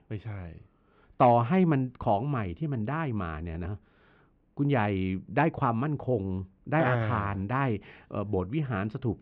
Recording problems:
muffled; very; fading above 3 kHz

